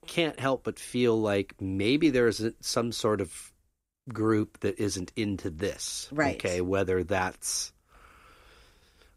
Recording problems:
none

